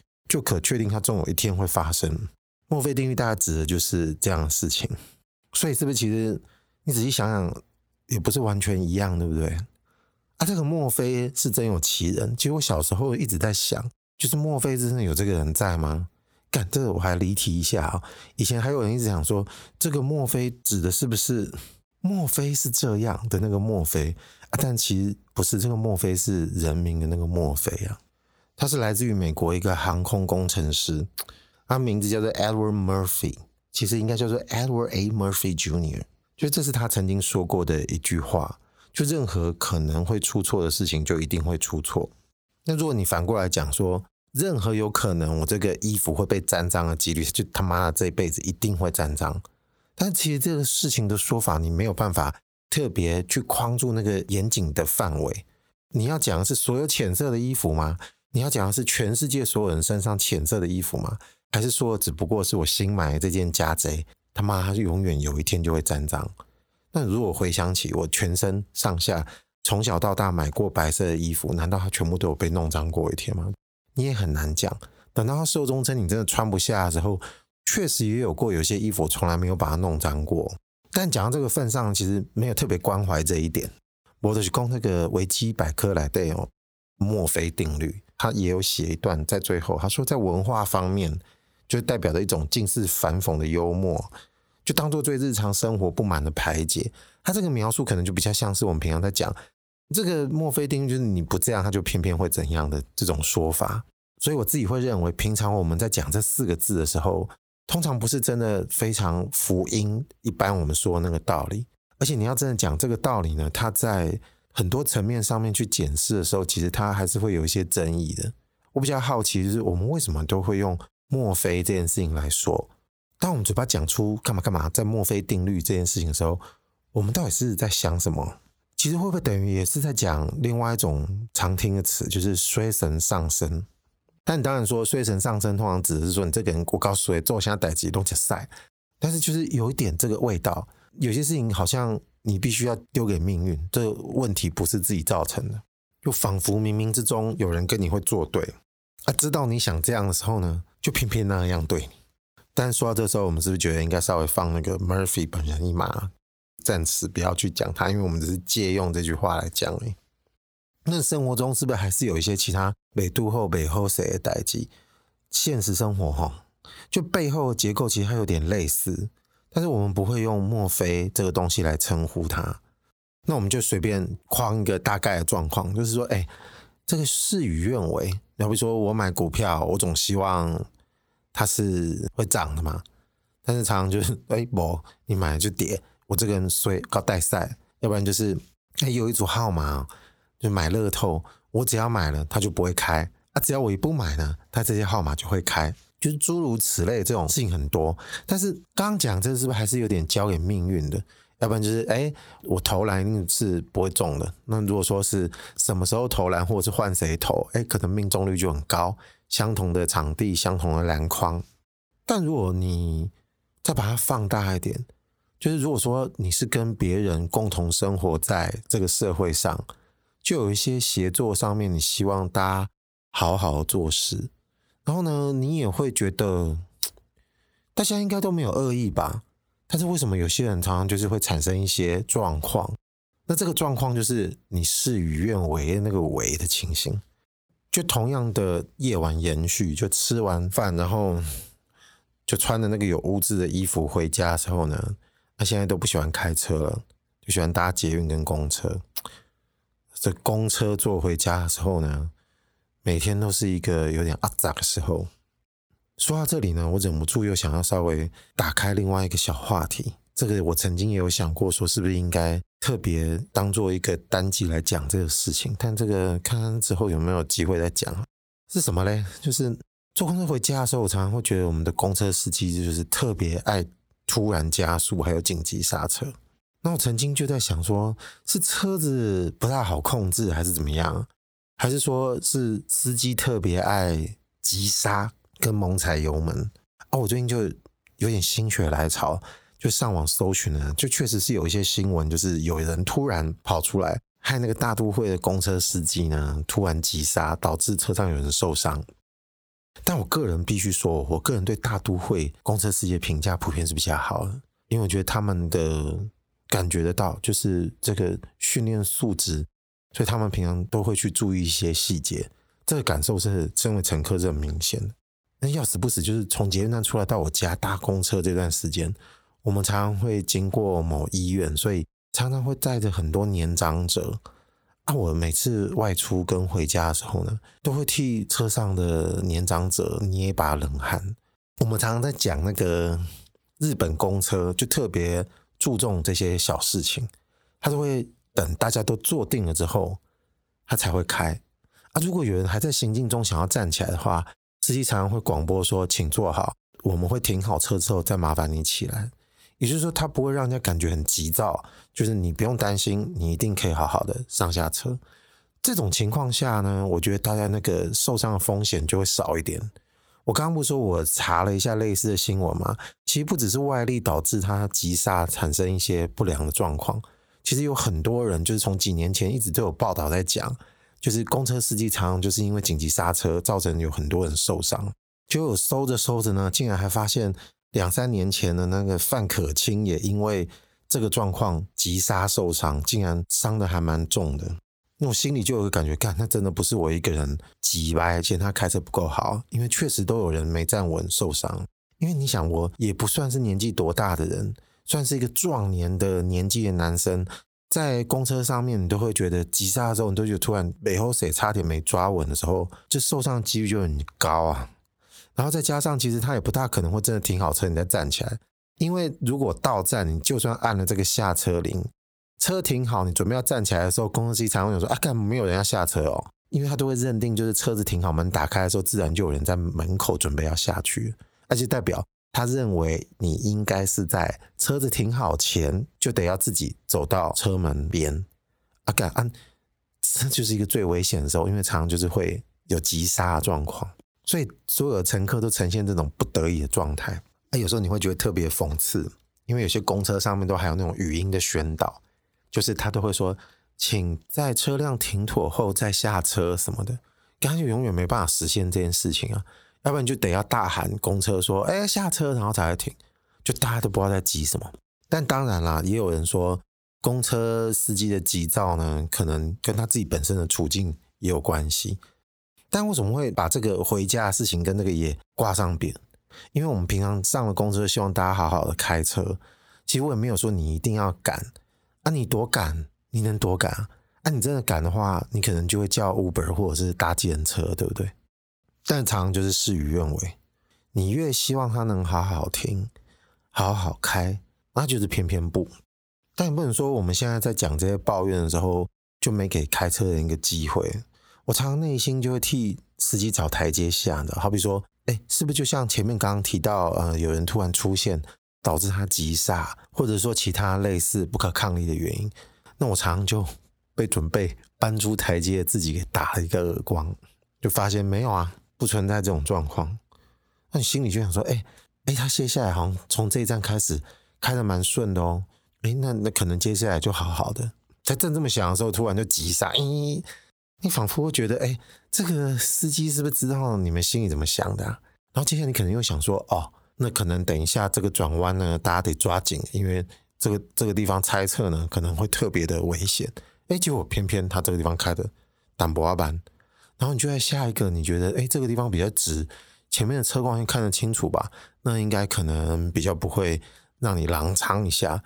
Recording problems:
squashed, flat; heavily

